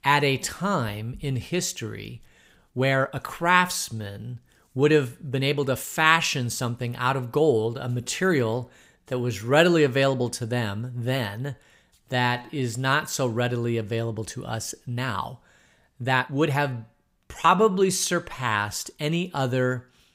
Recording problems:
uneven, jittery; strongly; from 2.5 to 19 s

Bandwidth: 15.5 kHz